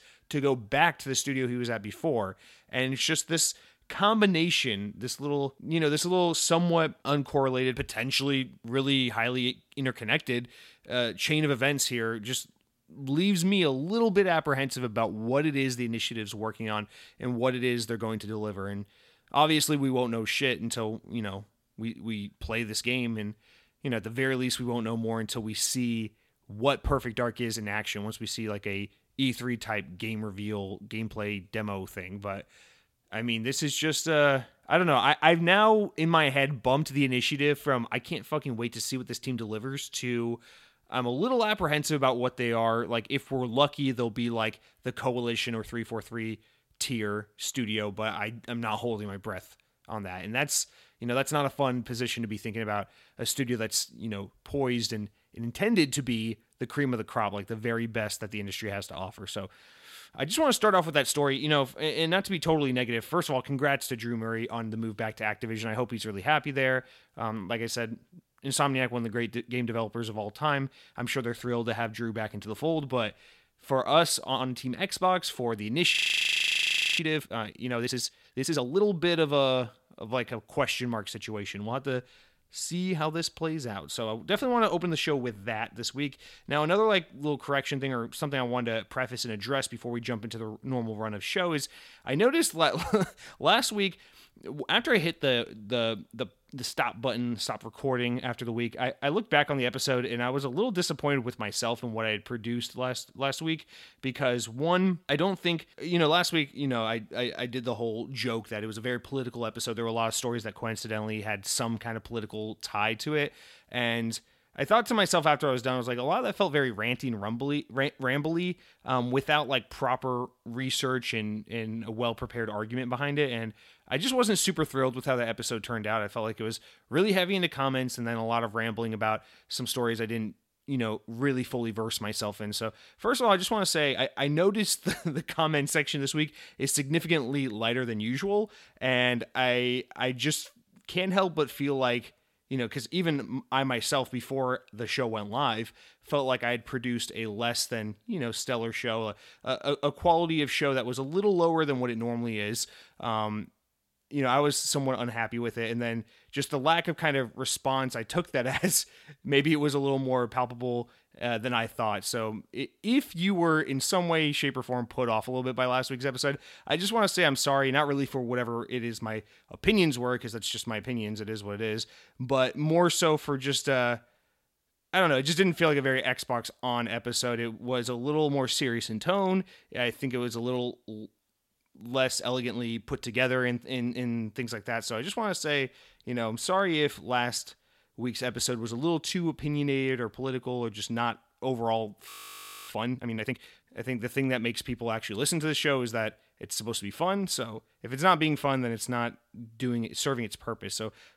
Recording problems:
audio freezing; at 1:16 for 1 s and at 3:12 for 0.5 s

